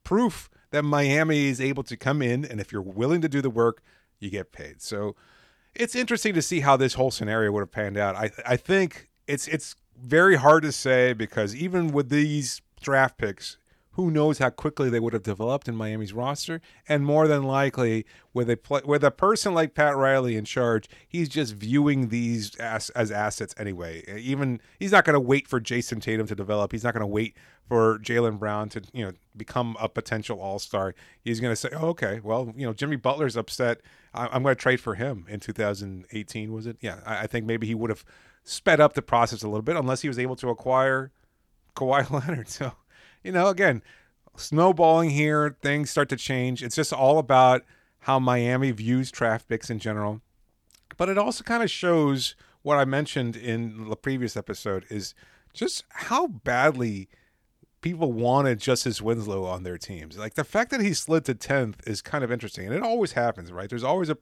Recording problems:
none

